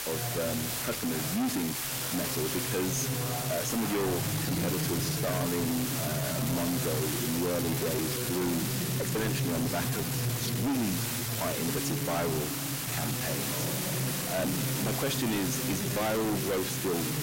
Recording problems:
distortion; heavy; 29% of the sound clipped
voice in the background; loud; throughout; 2 dB below the speech
hiss; loud; throughout; as loud as the speech
uneven, jittery; strongly; from 1 to 16 s

